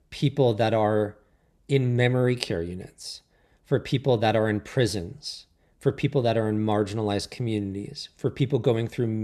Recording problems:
abrupt cut into speech; at the end

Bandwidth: 13.5 kHz